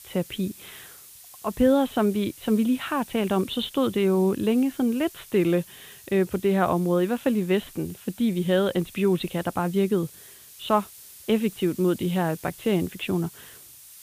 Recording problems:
high frequencies cut off; severe; nothing above 4 kHz
hiss; noticeable; throughout; 20 dB below the speech

